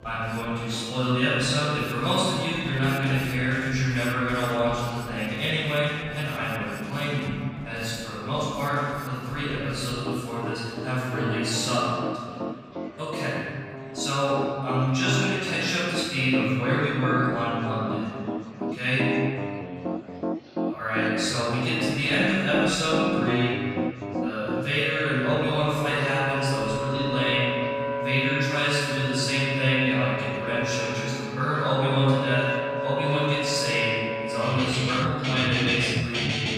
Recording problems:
room echo; strong; dies away in 2.1 s
off-mic speech; far
background music; loud; throughout; 6 dB below the speech
chatter from many people; faint; throughout; 20 dB below the speech

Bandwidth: 15.5 kHz